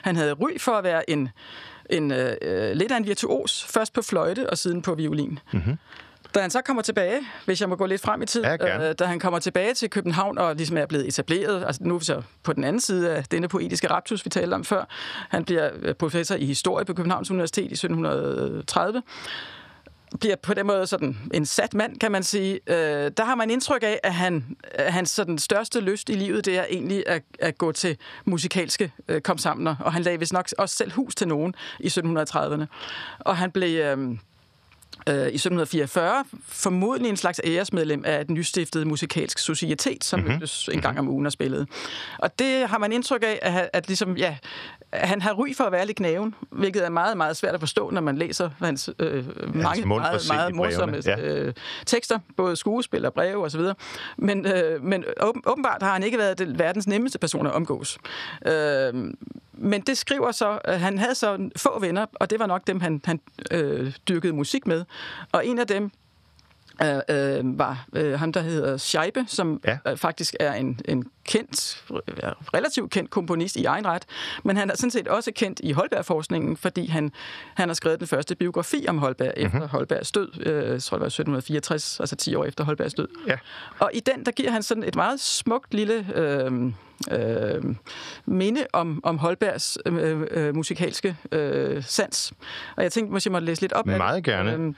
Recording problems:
squashed, flat; somewhat

